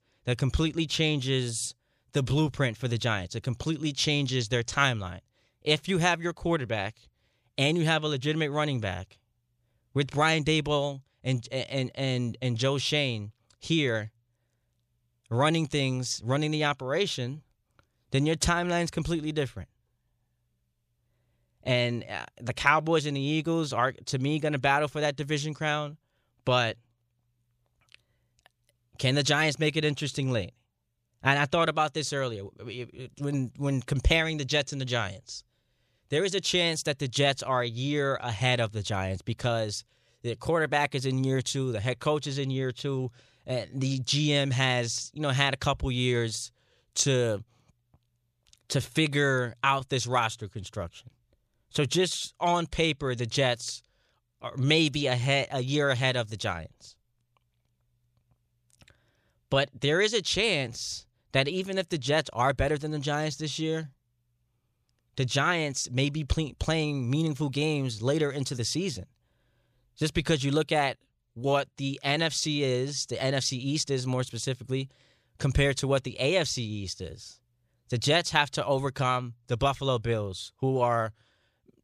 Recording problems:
none

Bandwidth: 14.5 kHz